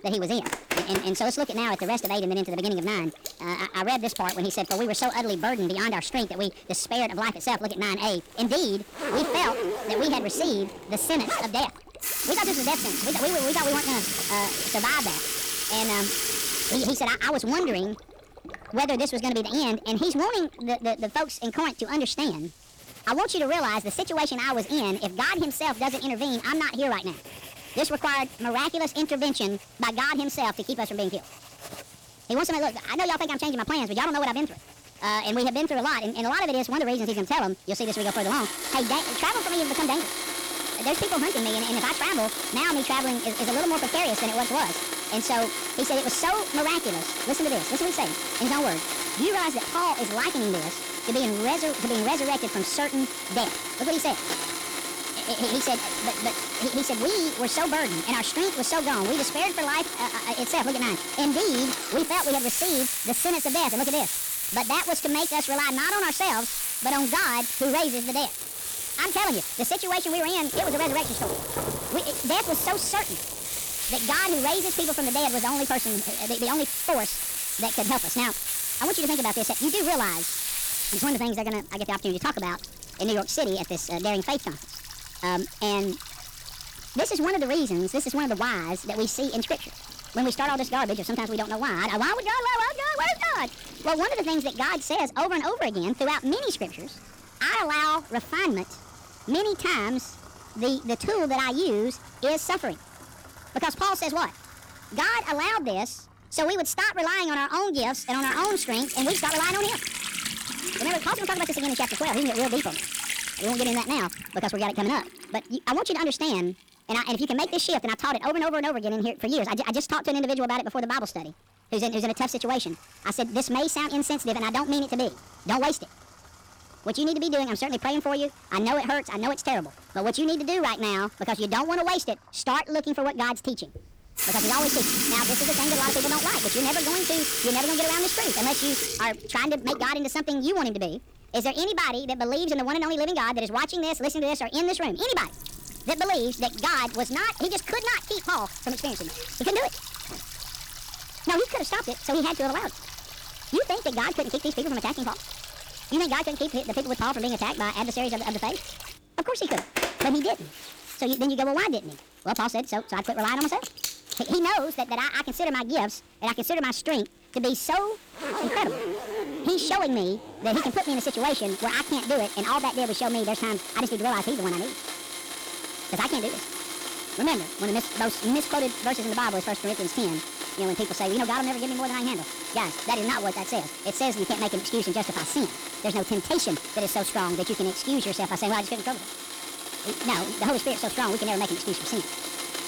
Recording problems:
wrong speed and pitch; too fast and too high; 1.6 times normal speed
distortion; slight; 8% of the sound clipped
household noises; loud; throughout; 3 dB below the speech
rain or running water; faint; throughout; 20 dB below the speech

